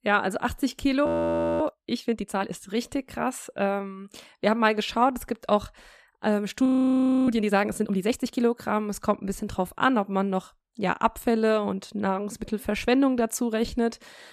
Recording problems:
audio freezing; at 1 s for 0.5 s and at 6.5 s for 0.5 s

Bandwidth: 14.5 kHz